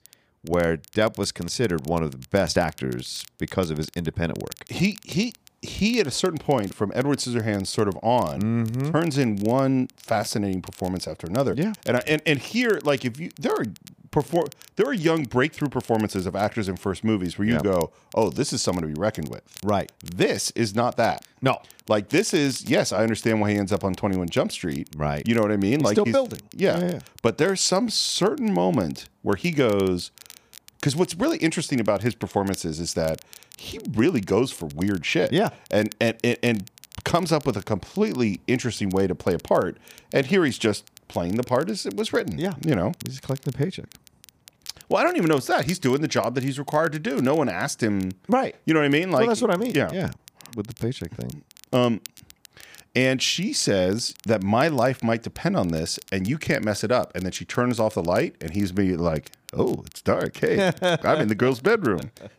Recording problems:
crackle, like an old record; faint; 25 dB below the speech

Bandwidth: 15 kHz